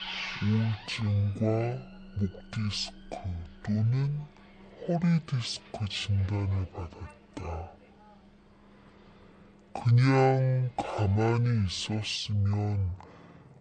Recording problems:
wrong speed and pitch; too slow and too low; 0.5 times normal speed
traffic noise; noticeable; throughout; 20 dB below the speech

